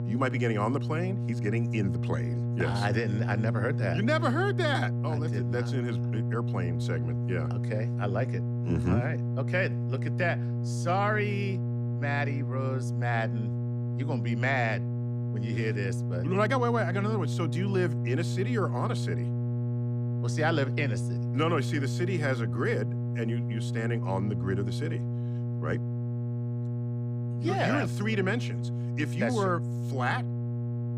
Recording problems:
electrical hum; loud; throughout; 60 Hz, 9 dB below the speech

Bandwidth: 15.5 kHz